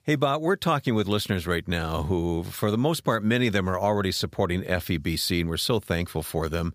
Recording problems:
none

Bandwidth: 15 kHz